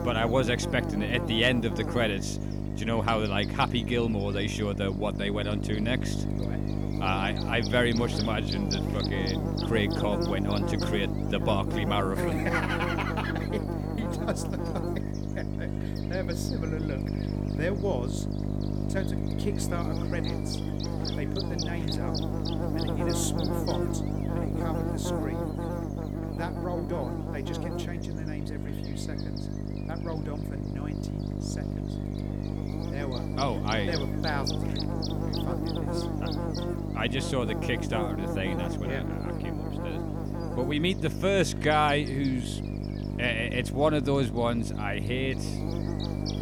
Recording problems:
electrical hum; loud; throughout; 50 Hz, 6 dB below the speech

